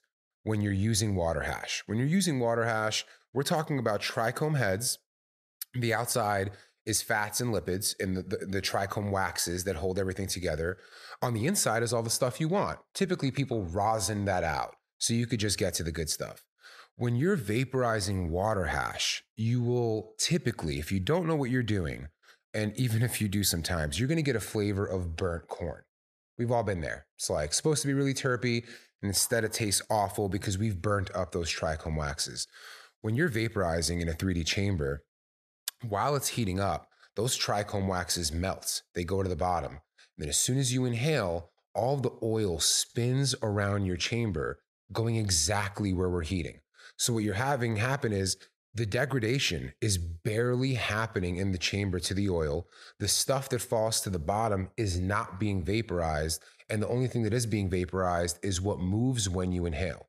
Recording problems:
none

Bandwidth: 14 kHz